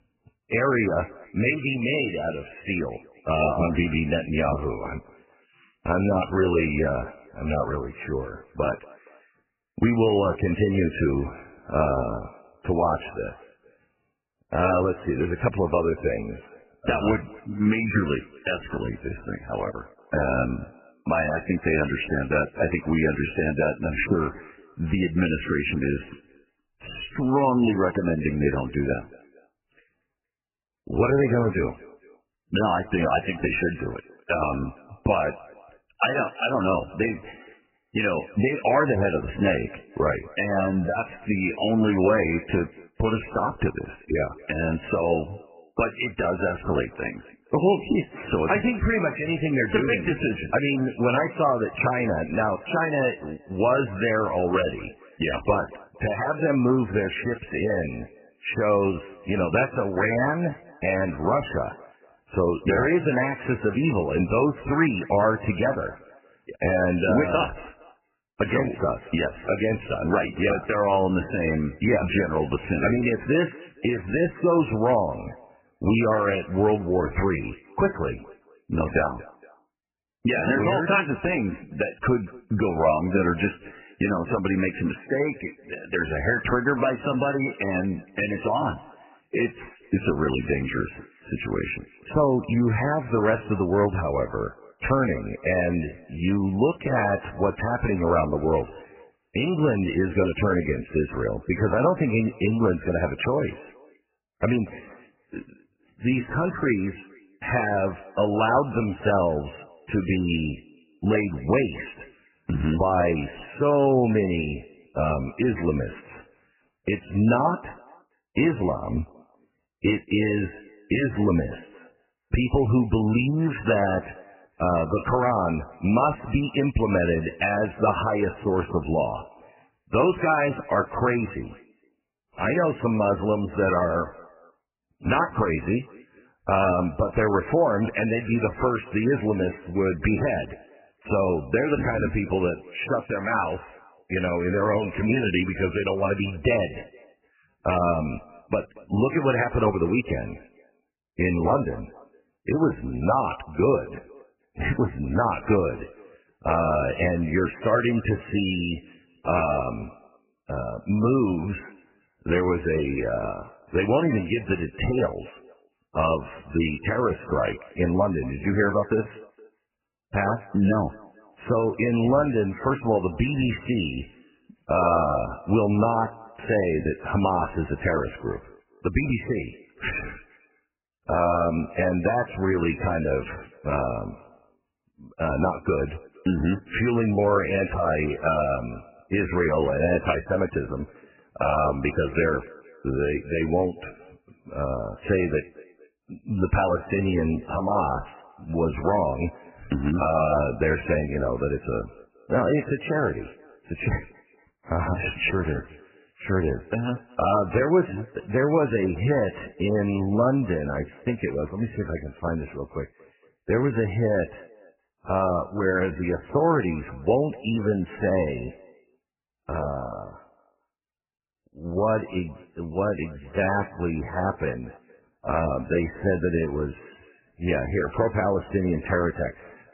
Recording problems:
garbled, watery; badly; nothing above 3 kHz
echo of what is said; faint; throughout; 230 ms later, 25 dB below the speech

